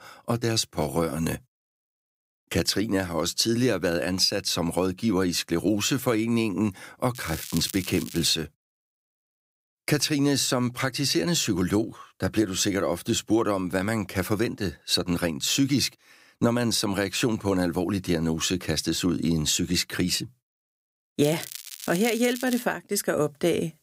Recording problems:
crackling; noticeable; from 7 to 8.5 s and from 21 to 23 s; 10 dB below the speech

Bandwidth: 15.5 kHz